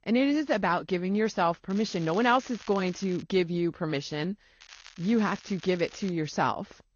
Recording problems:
garbled, watery; slightly; nothing above 6.5 kHz
crackling; faint; from 1.5 to 3 s and from 4.5 to 6 s; 20 dB below the speech

